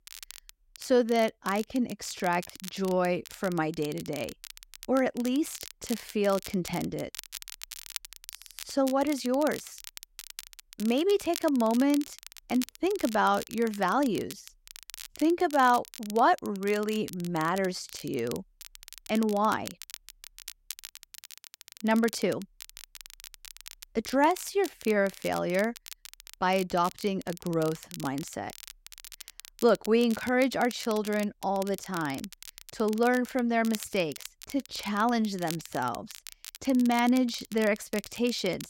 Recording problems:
crackle, like an old record; noticeable; 15 dB below the speech

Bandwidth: 16 kHz